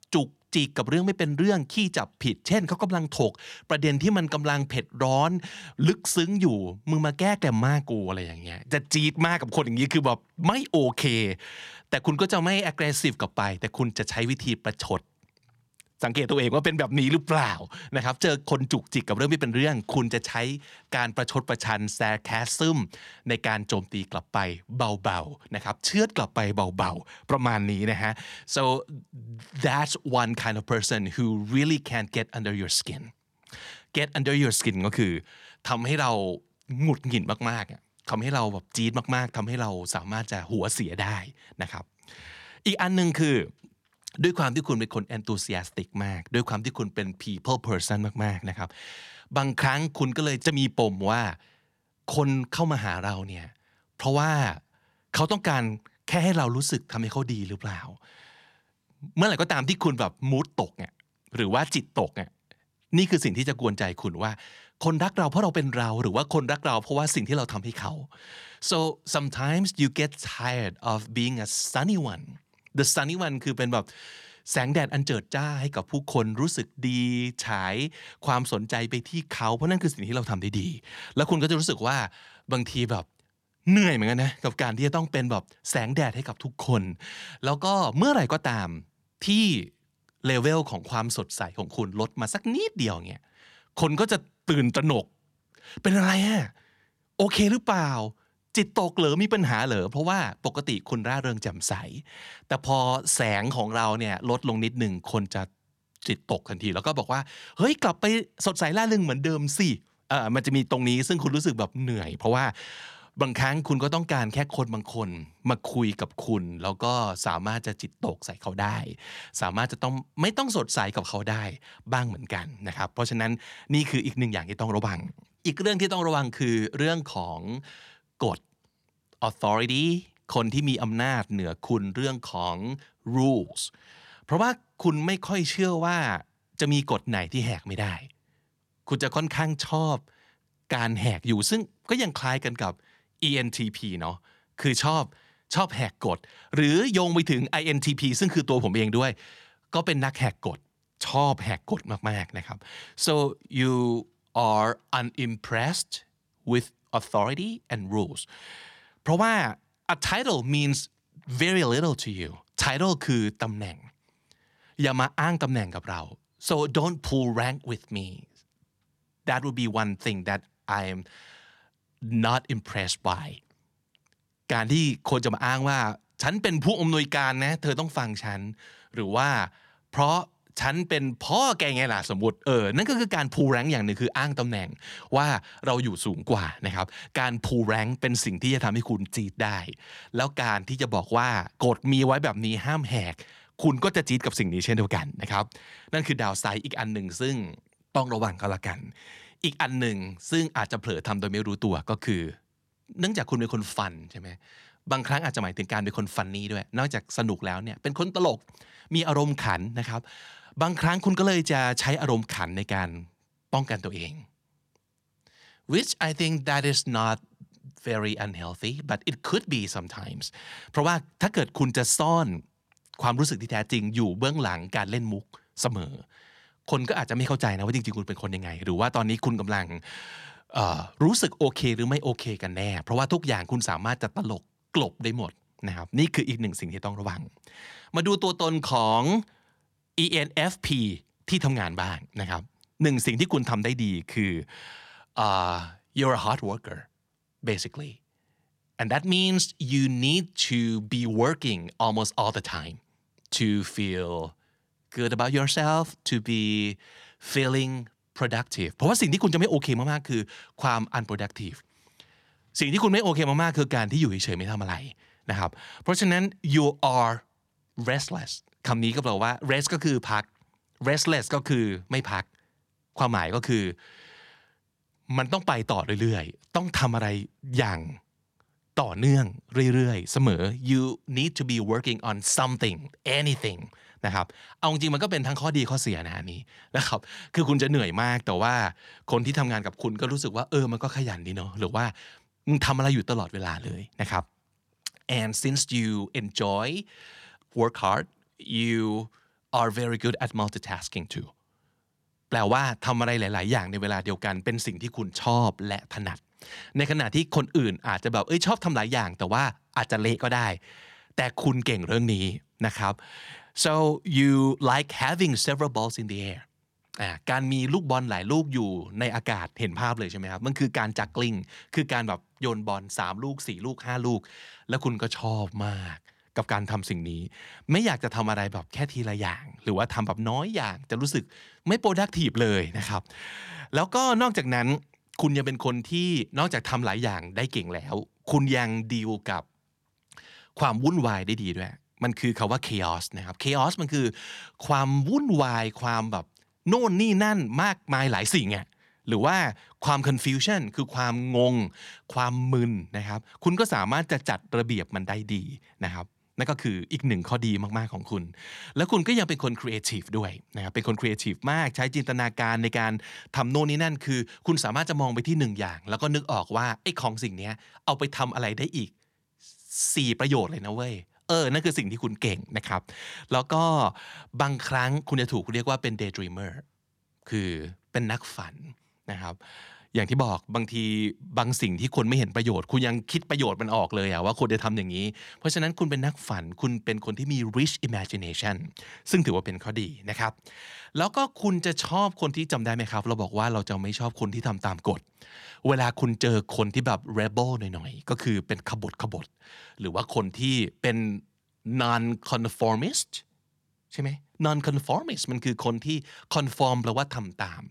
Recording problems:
none

